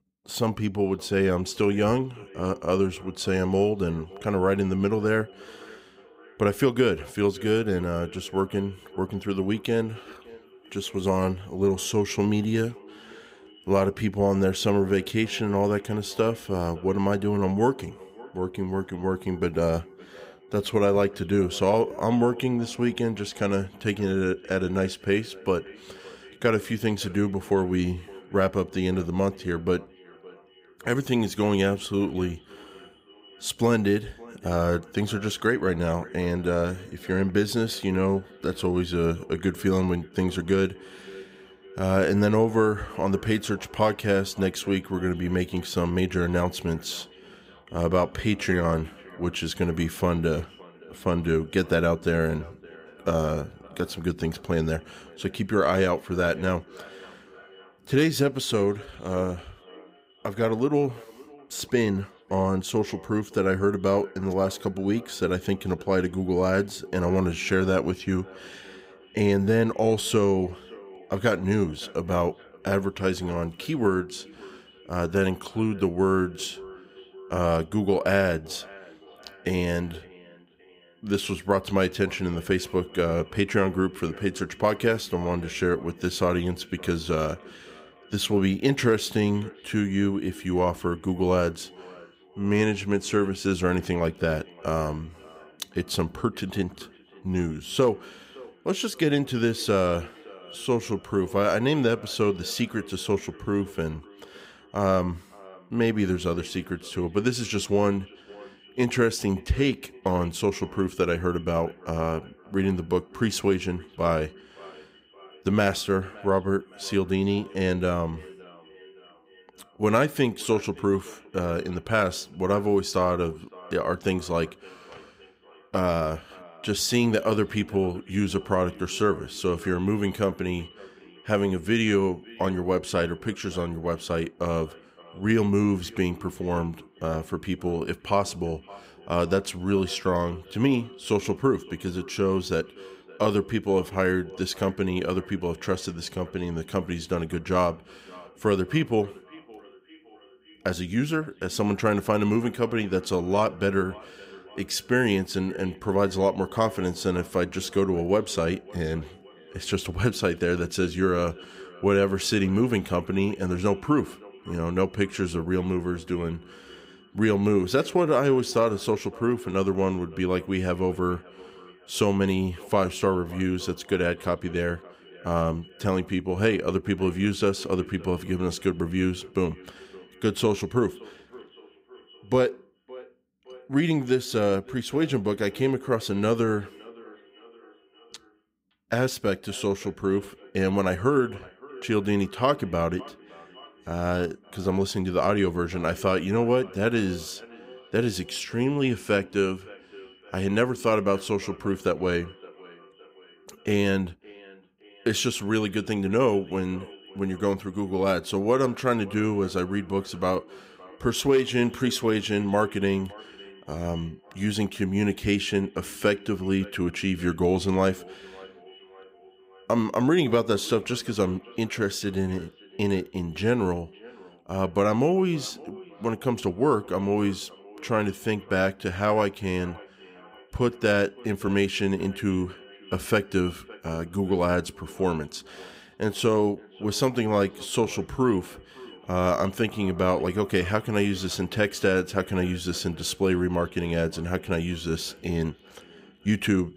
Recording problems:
echo of what is said; faint; throughout; 560 ms later, 20 dB below the speech

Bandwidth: 15.5 kHz